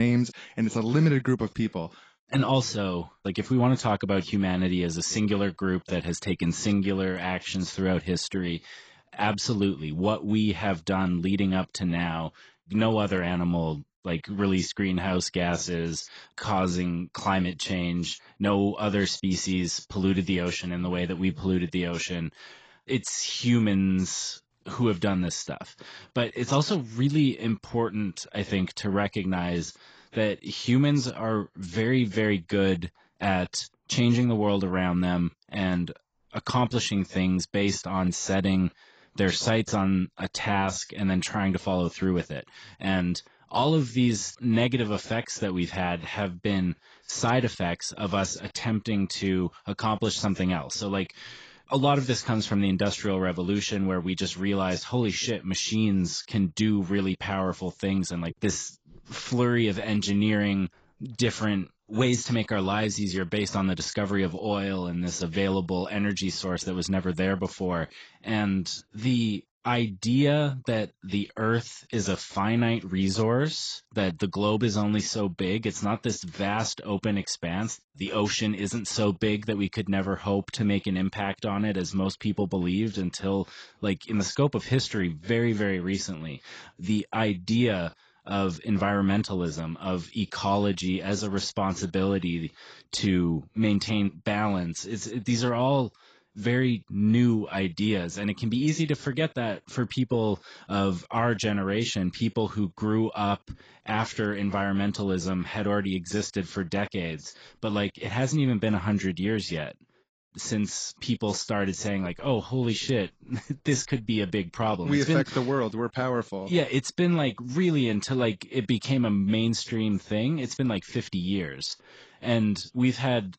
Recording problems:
garbled, watery; badly; nothing above 7.5 kHz
abrupt cut into speech; at the start

